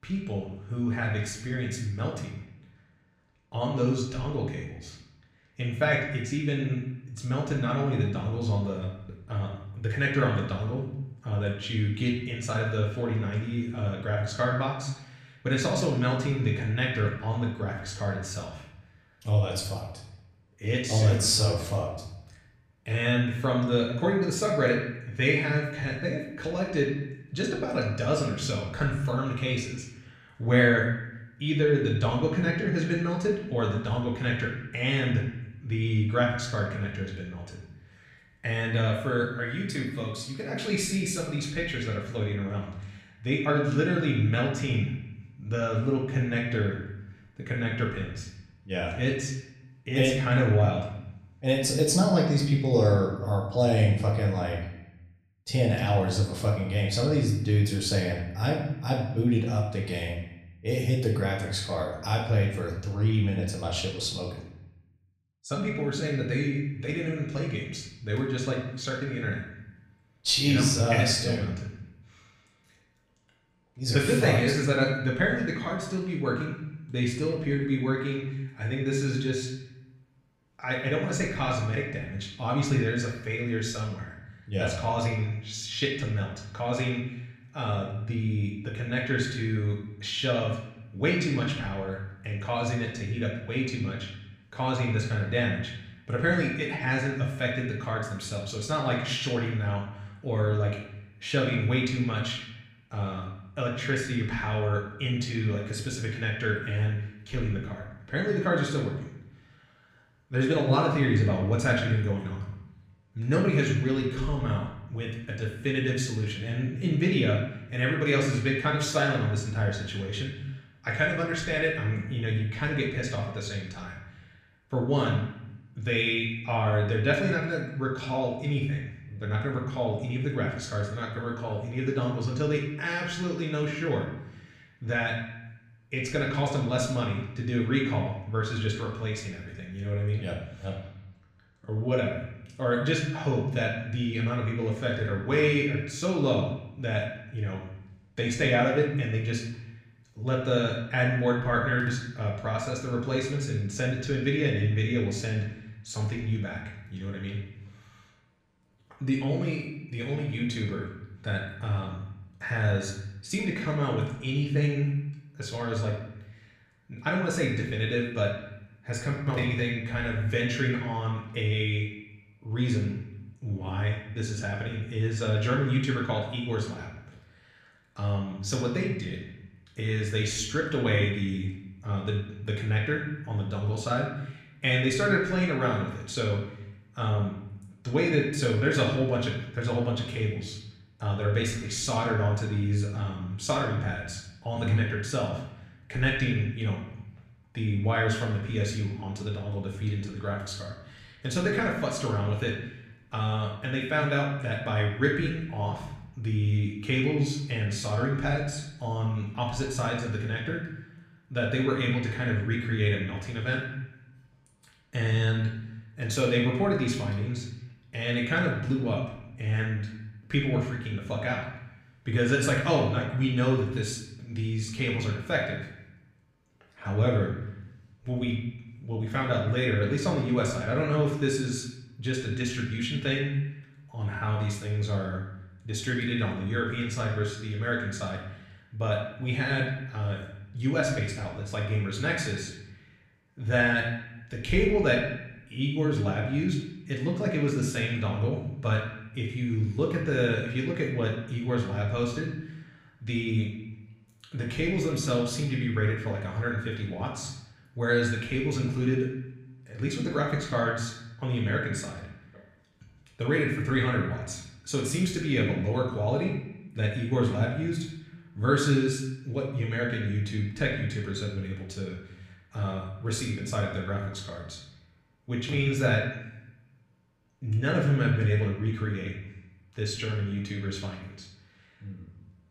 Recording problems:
off-mic speech; far
room echo; noticeable; dies away in 0.8 s

